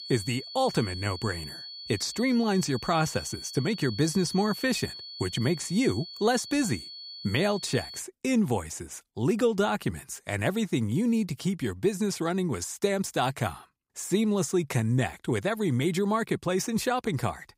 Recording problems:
high-pitched whine; noticeable; until 8 s; 4.5 kHz, 10 dB below the speech

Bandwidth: 15.5 kHz